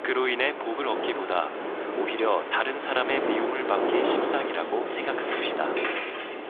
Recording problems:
phone-call audio; nothing above 3.5 kHz
wind noise on the microphone; heavy; 3 dB below the speech
traffic noise; loud; throughout; 7 dB below the speech

